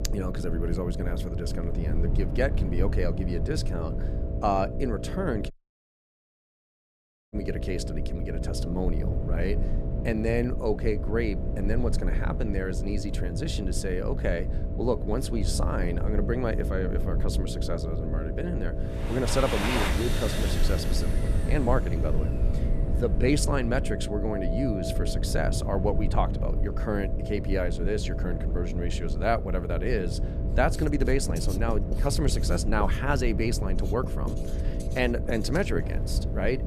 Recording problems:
household noises; loud; from 19 s on; 7 dB below the speech
electrical hum; noticeable; throughout; 60 Hz, 10 dB below the speech
low rumble; noticeable; throughout; 15 dB below the speech
audio cutting out; at 5.5 s for 2 s

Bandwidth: 14.5 kHz